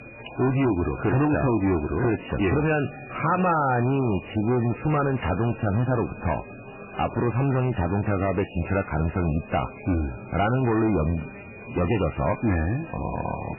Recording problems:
distortion; heavy; 16% of the sound clipped
garbled, watery; badly; nothing above 3 kHz
chatter from many people; noticeable; throughout; 15 dB below the speech
high-pitched whine; faint; throughout; 2.5 kHz, 20 dB below the speech

